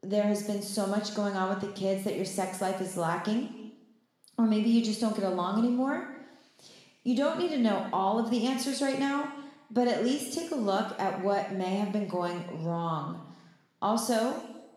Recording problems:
room echo; noticeable; dies away in 1 s
off-mic speech; somewhat distant

